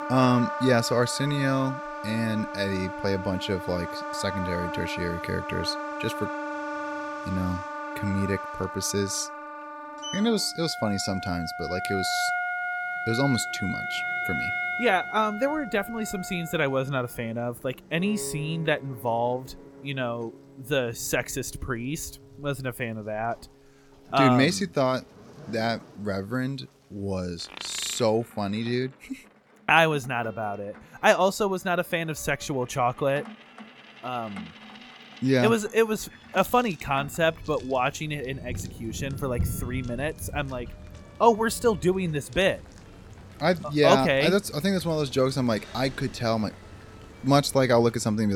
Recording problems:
background music; loud; throughout; 6 dB below the speech
rain or running water; noticeable; throughout; 15 dB below the speech
household noises; faint; throughout; 25 dB below the speech
abrupt cut into speech; at the end

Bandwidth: 18 kHz